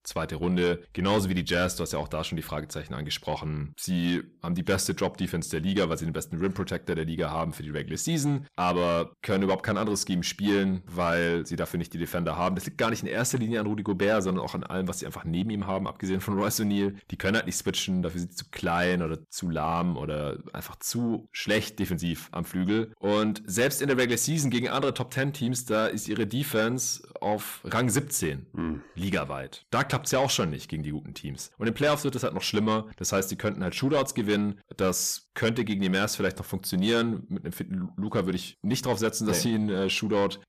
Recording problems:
distortion; slight; 10 dB below the speech

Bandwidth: 14.5 kHz